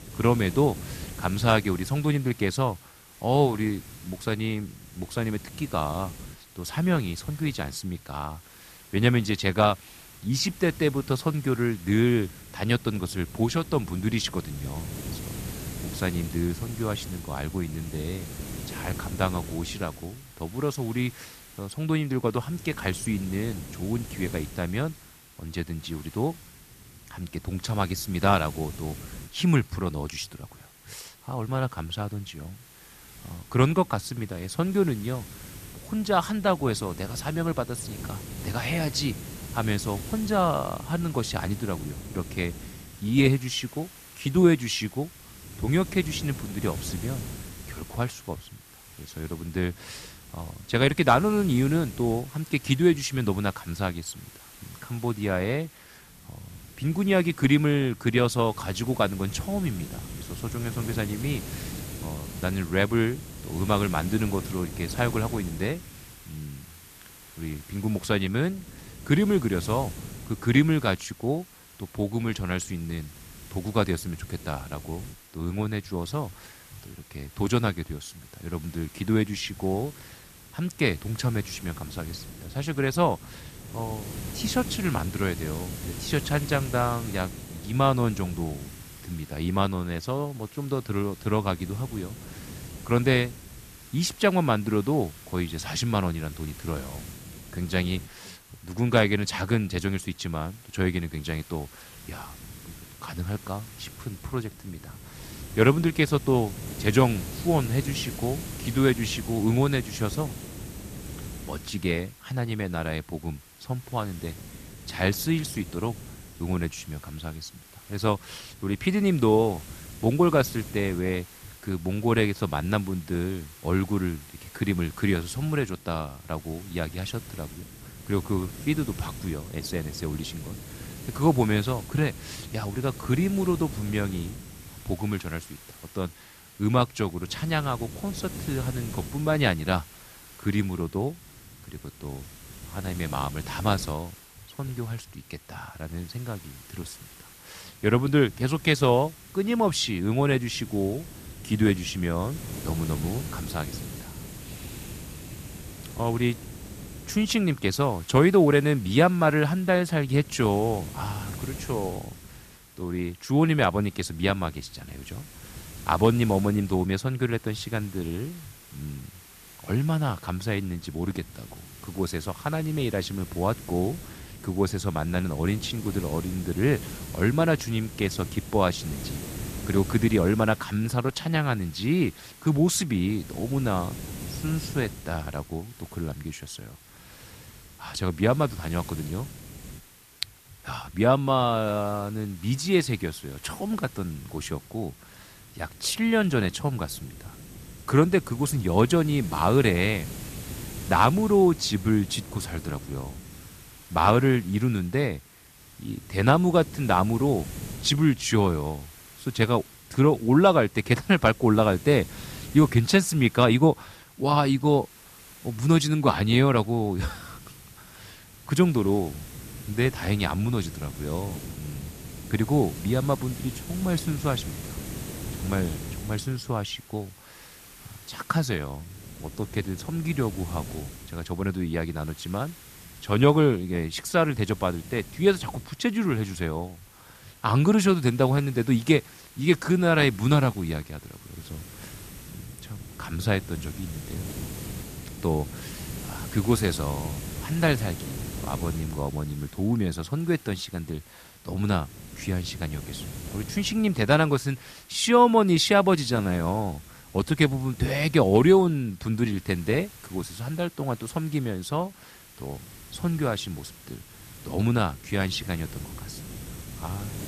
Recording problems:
hiss; noticeable; throughout; 15 dB below the speech

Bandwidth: 14.5 kHz